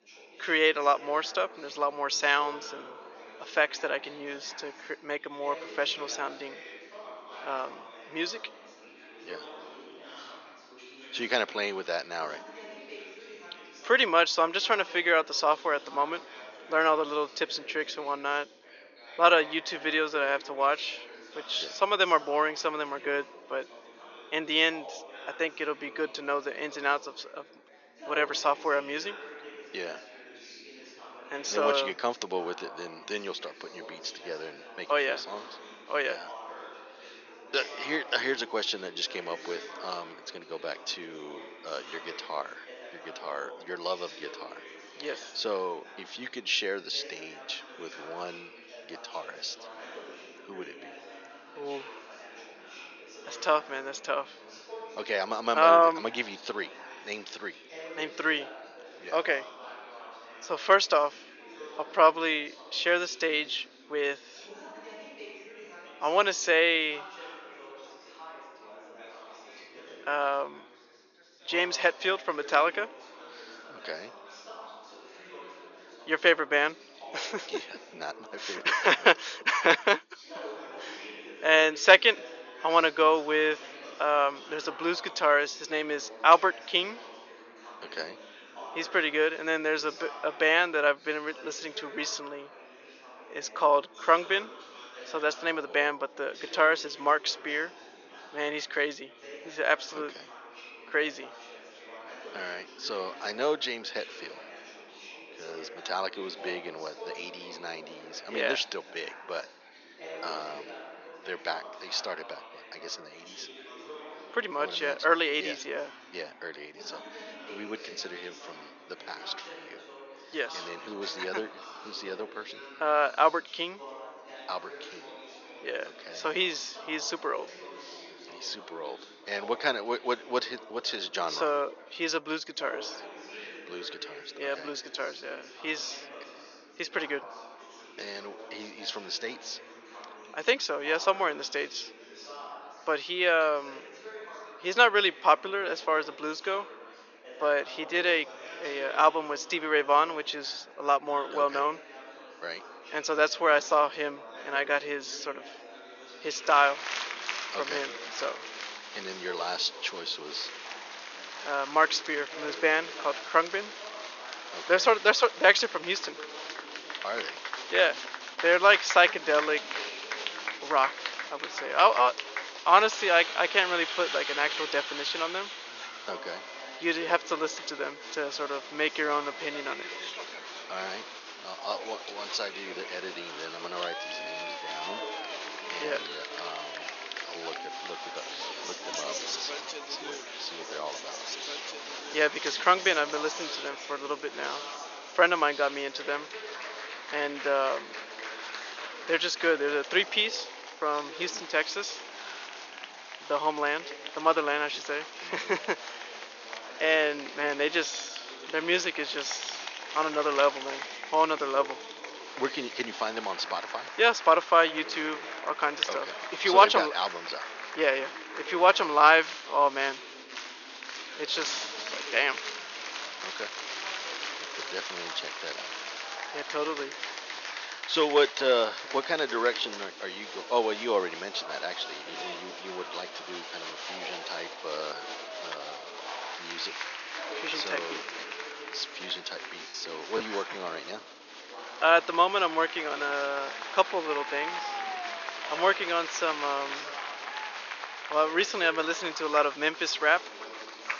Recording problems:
thin; very; fading below 450 Hz
high frequencies cut off; noticeable; nothing above 7 kHz
chatter from many people; noticeable; throughout; 15 dB below the speech
choppy; occasionally; at 4:00; 4% of the speech affected

